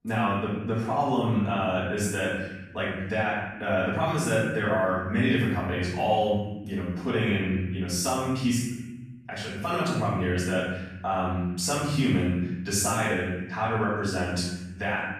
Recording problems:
room echo; strong; dies away in 1.2 s
off-mic speech; far

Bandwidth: 14 kHz